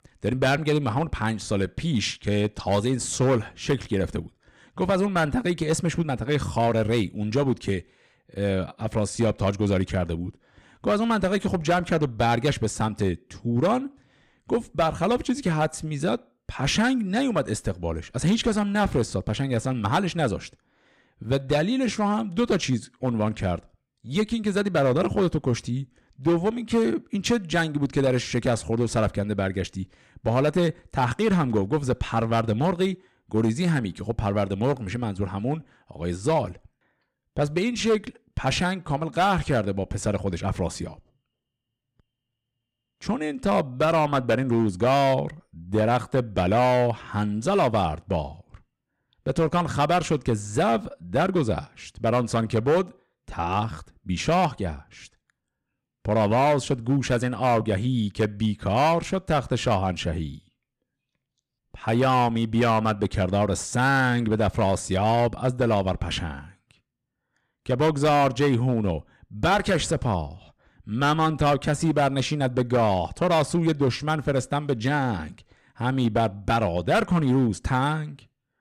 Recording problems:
distortion; slight; 5% of the sound clipped

